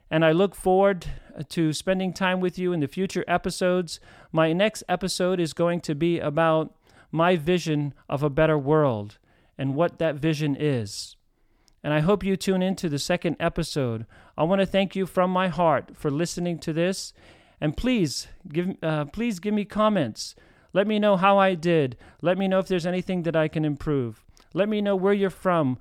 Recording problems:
none

